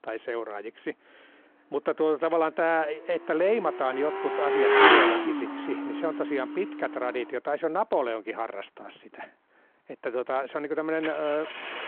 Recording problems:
phone-call audio
traffic noise; very loud; throughout; 4 dB above the speech

